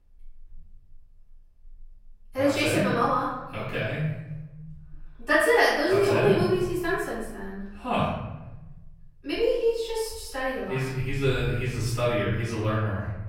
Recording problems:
off-mic speech; far
room echo; noticeable; dies away in 1.2 s

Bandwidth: 16 kHz